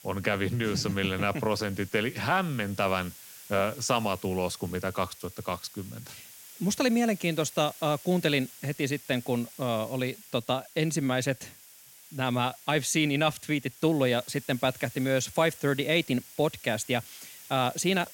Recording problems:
hiss; noticeable; throughout; 20 dB below the speech

